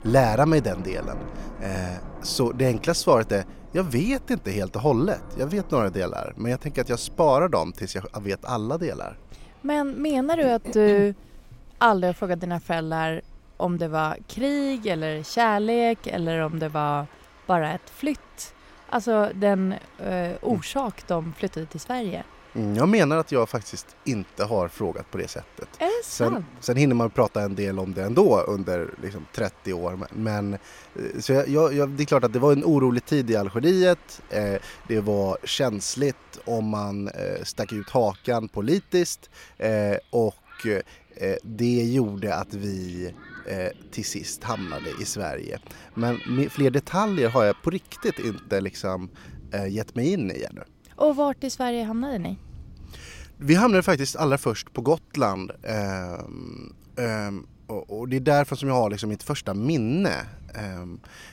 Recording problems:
rain or running water; faint; throughout; 20 dB below the speech

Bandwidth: 16 kHz